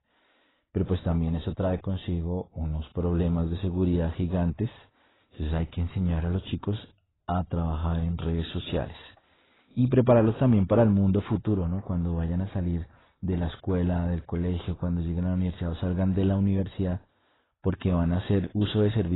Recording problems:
garbled, watery; badly; nothing above 4 kHz
abrupt cut into speech; at the end

